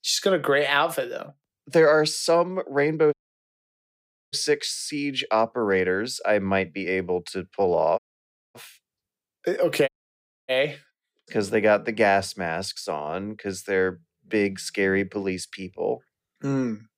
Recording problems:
audio cutting out; at 3 s for 1 s, at 8 s for 0.5 s and at 10 s for 0.5 s

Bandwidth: 15.5 kHz